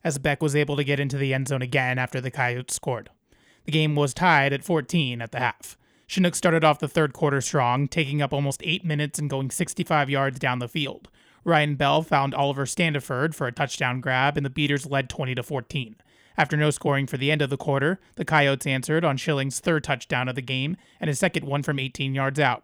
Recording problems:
none

